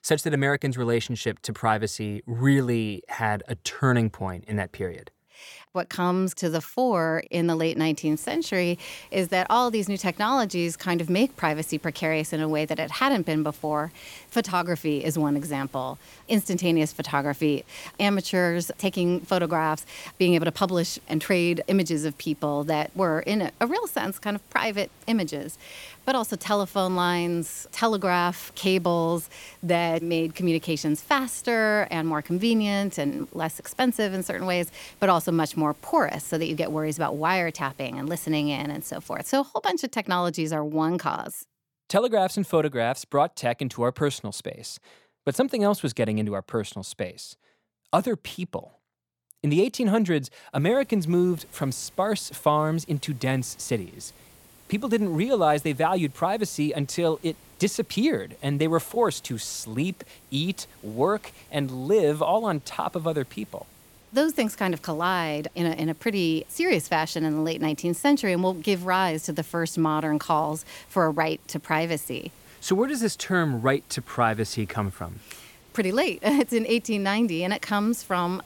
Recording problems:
hiss; faint; from 8 to 39 s and from 51 s on; 25 dB below the speech

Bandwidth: 17 kHz